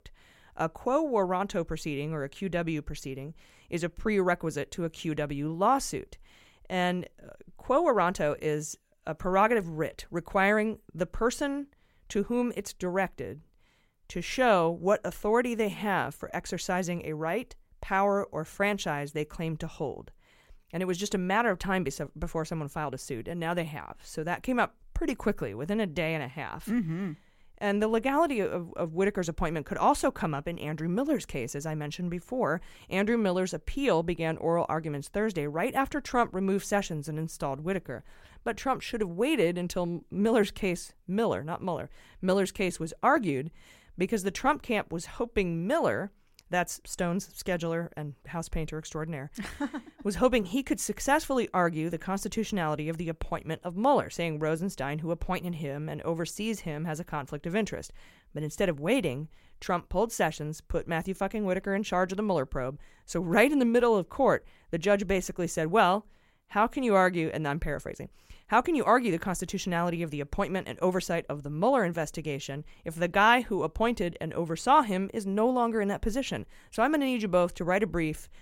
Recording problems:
none

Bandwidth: 16 kHz